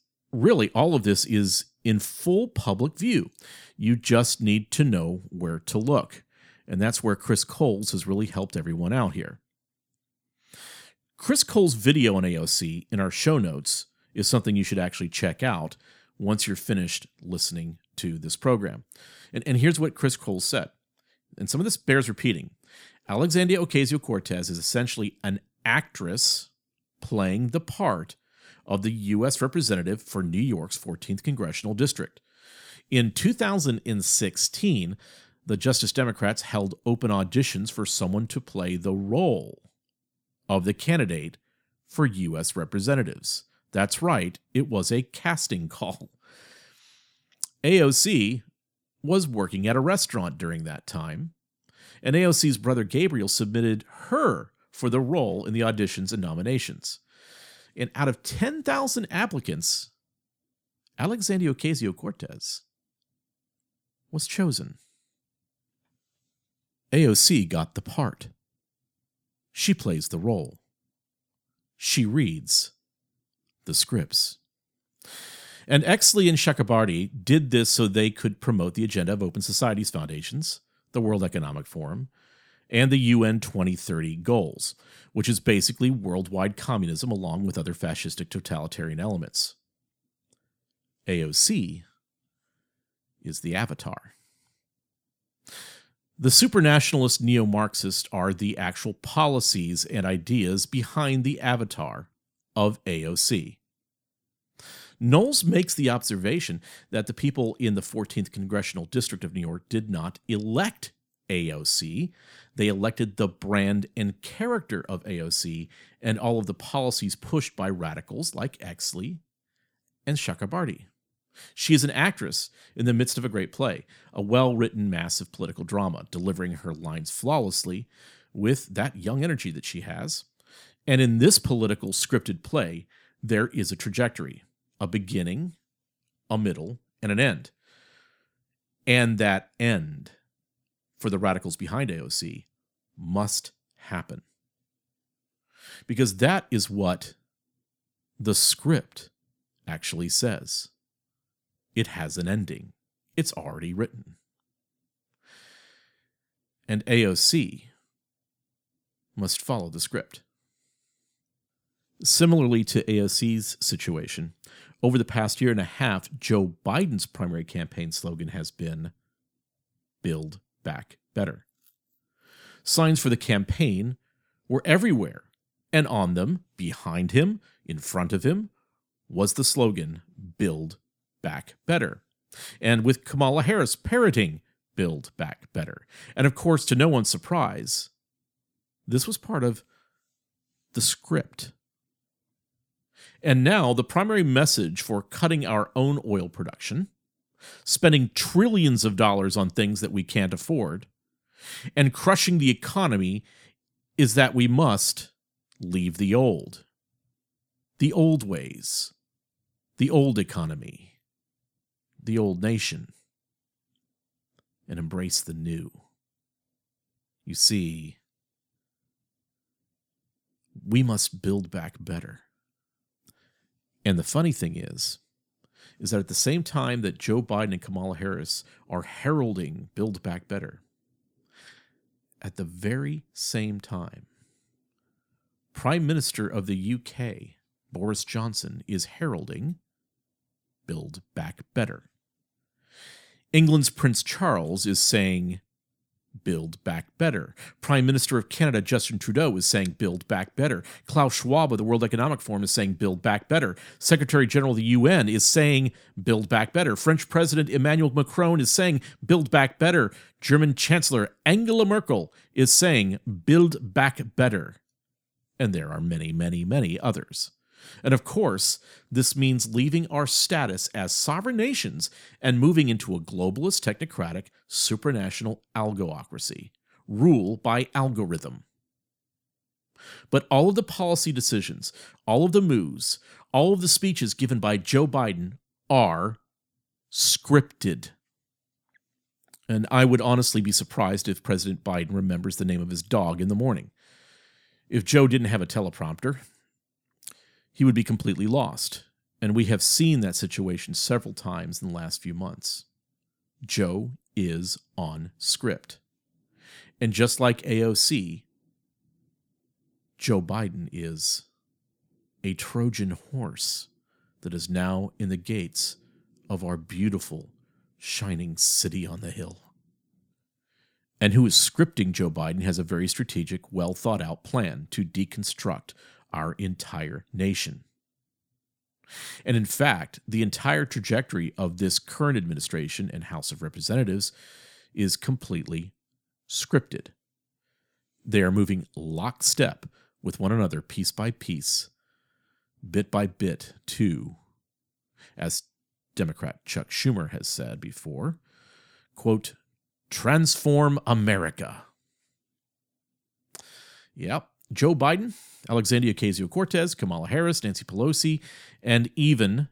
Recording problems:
none

